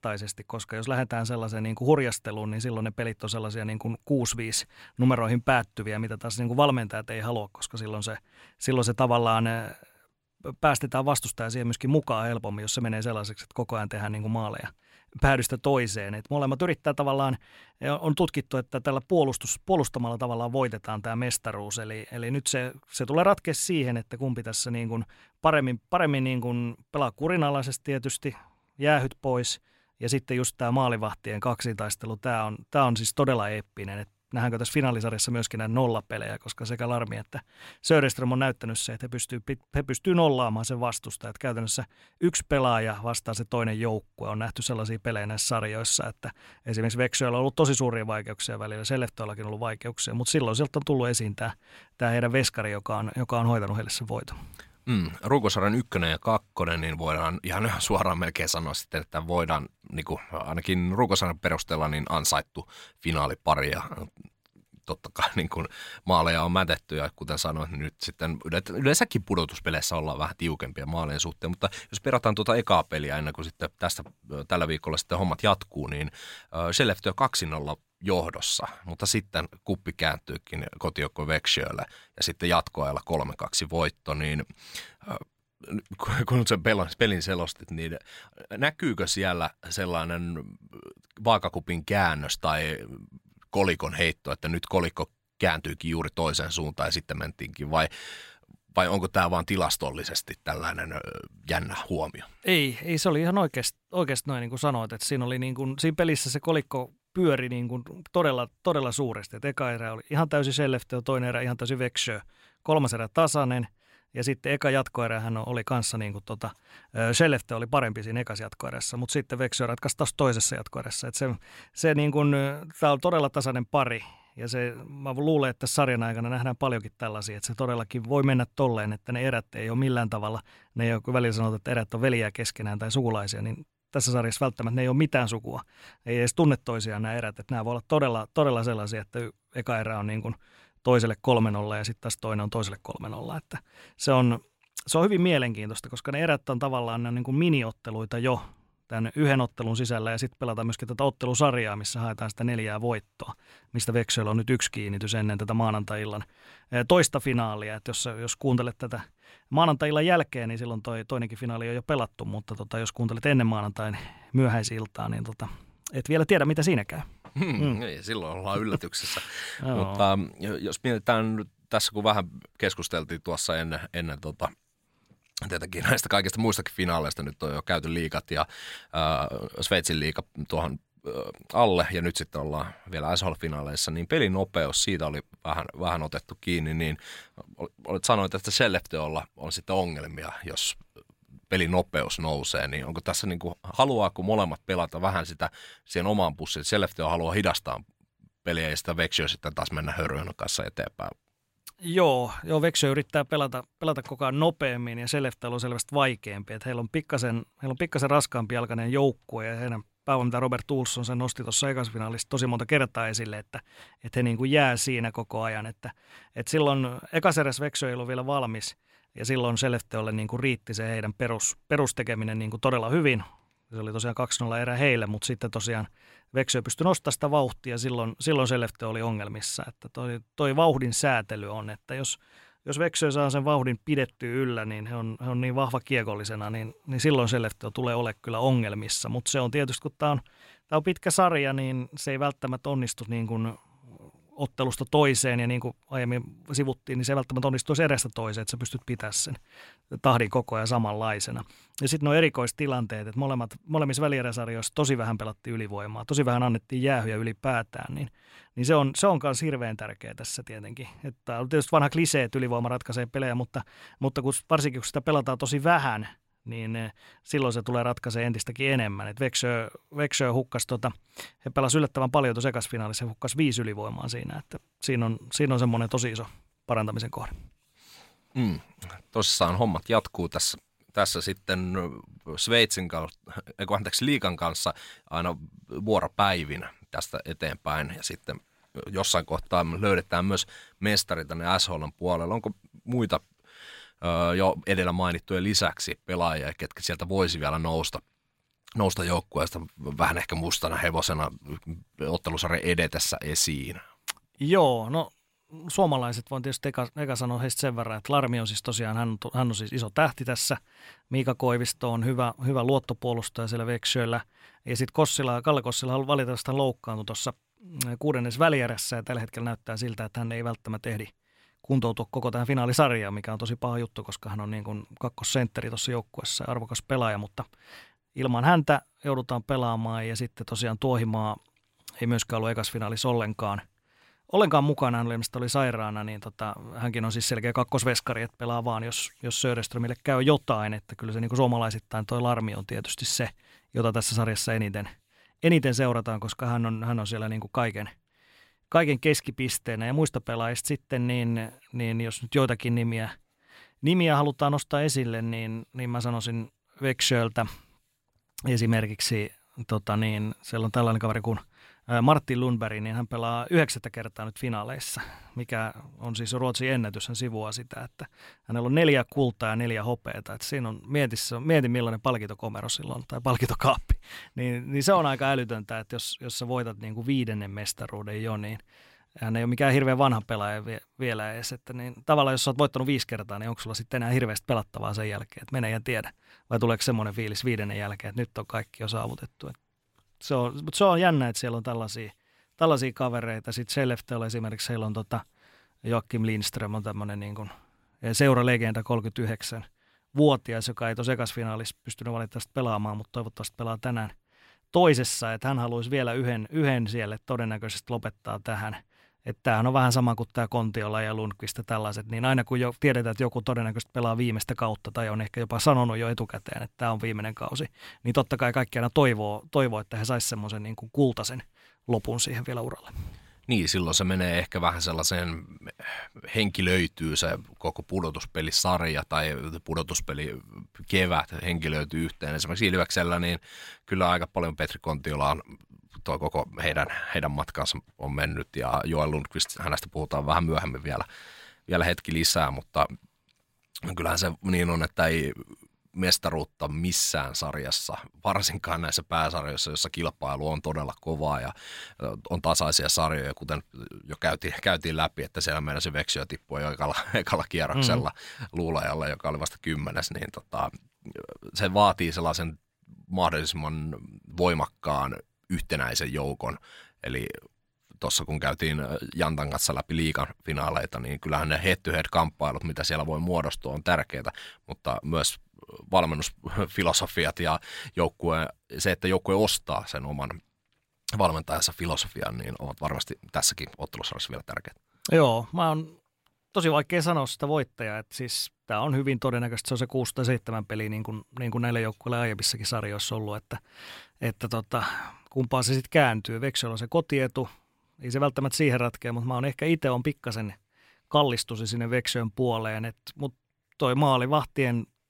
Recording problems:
none

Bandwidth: 16 kHz